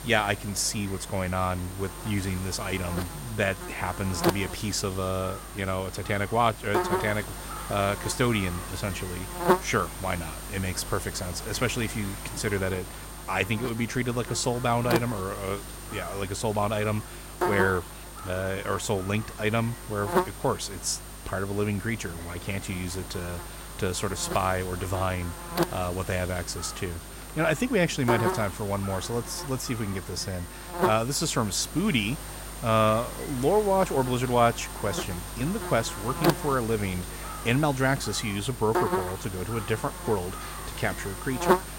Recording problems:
electrical hum; loud; throughout; 50 Hz, 6 dB below the speech
murmuring crowd; faint; throughout; 25 dB below the speech

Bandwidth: 16 kHz